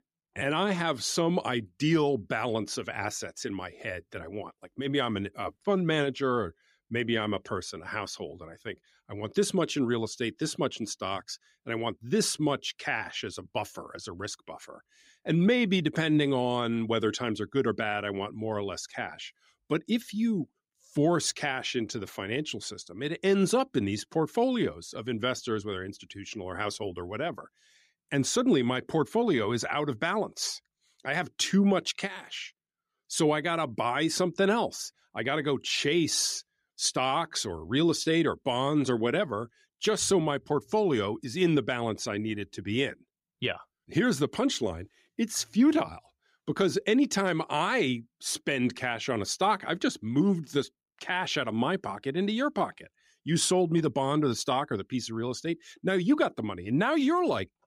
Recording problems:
none

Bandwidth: 15.5 kHz